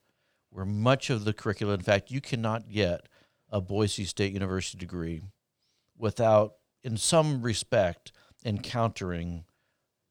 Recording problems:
none

